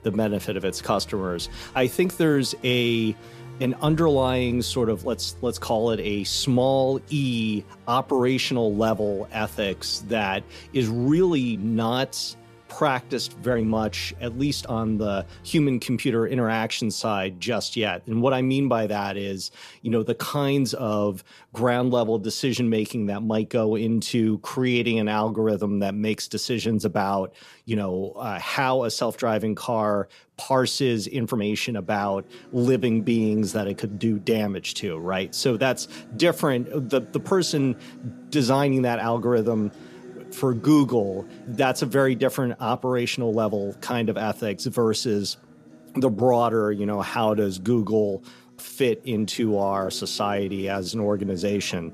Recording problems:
background music; faint; throughout; 20 dB below the speech
uneven, jittery; slightly; from 11 to 51 s

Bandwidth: 14.5 kHz